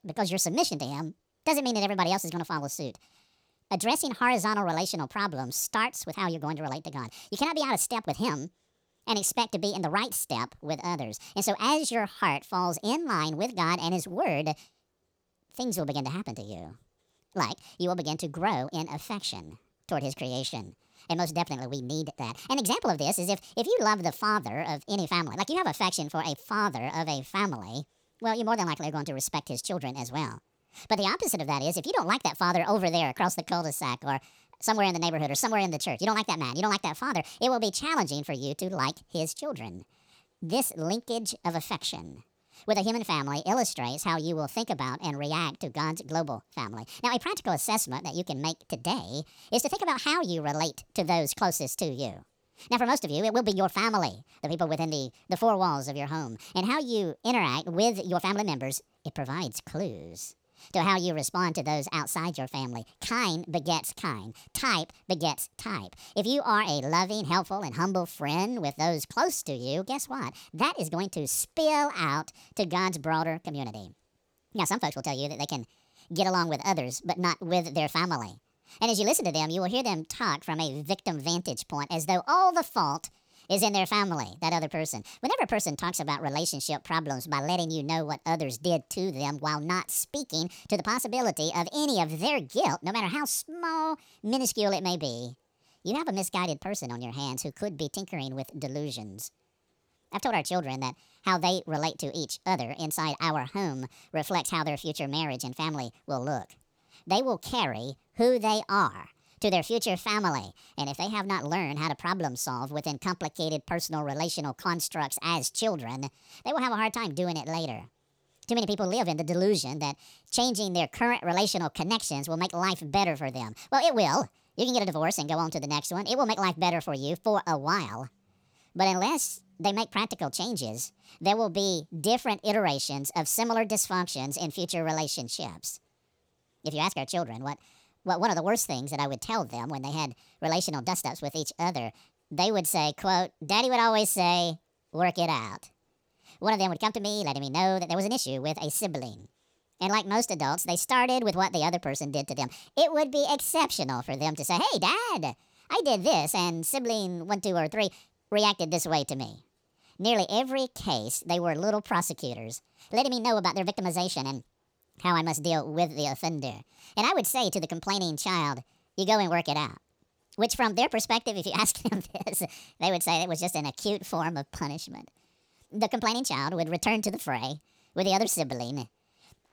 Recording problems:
wrong speed and pitch; too fast and too high; 1.5 times normal speed

